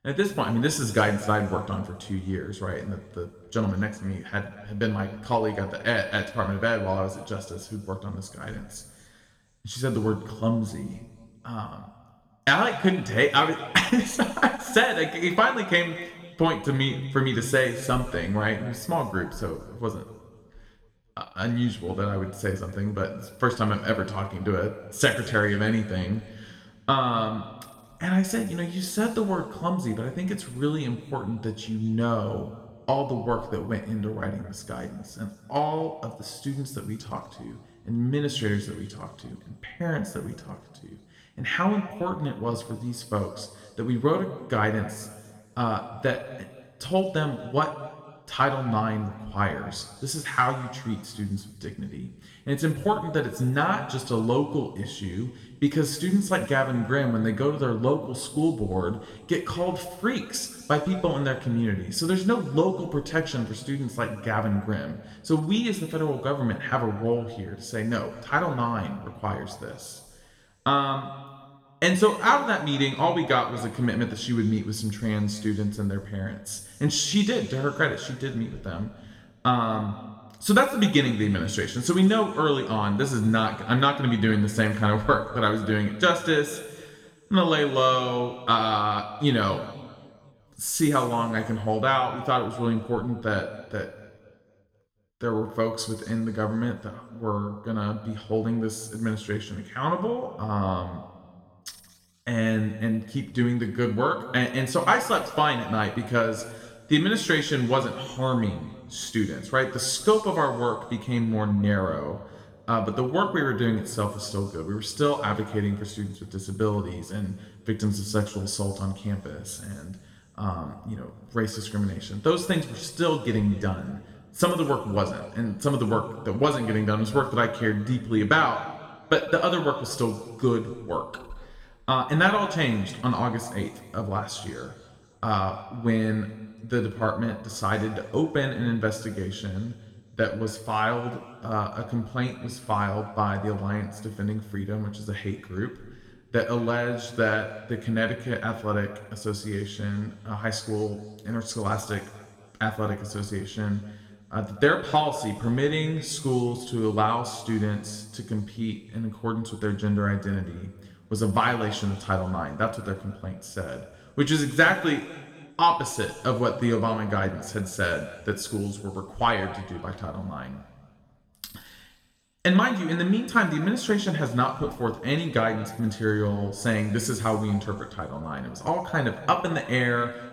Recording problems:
room echo; noticeable; dies away in 1.3 s
off-mic speech; somewhat distant

